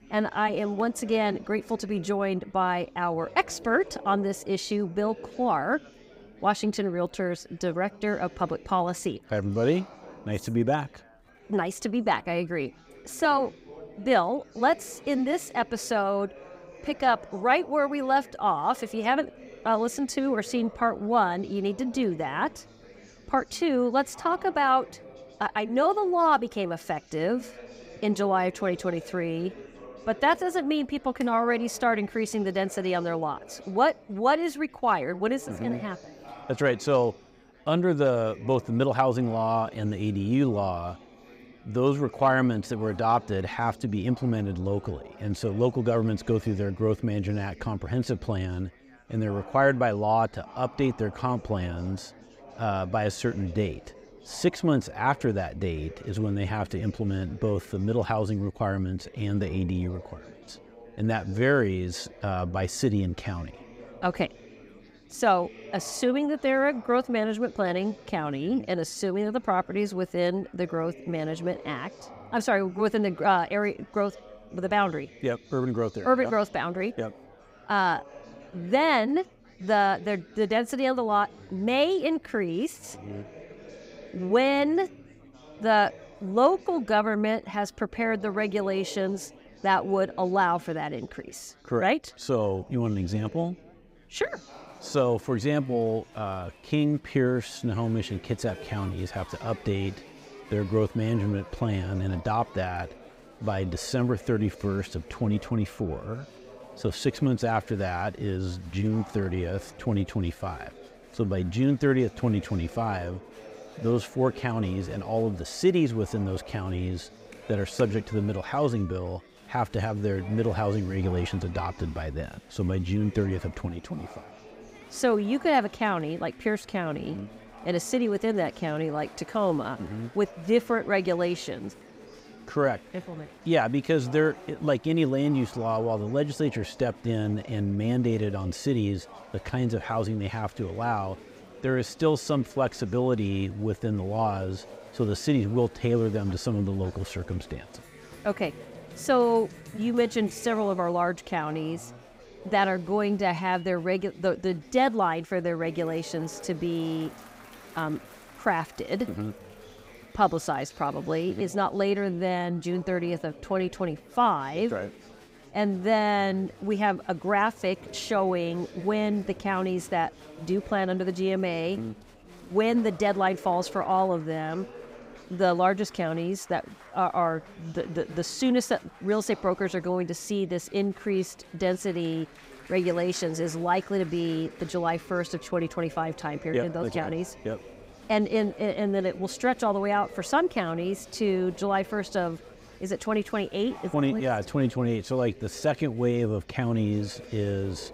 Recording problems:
chatter from many people; faint; throughout; 20 dB below the speech

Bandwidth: 15.5 kHz